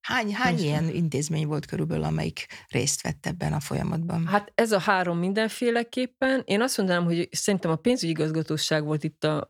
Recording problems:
none

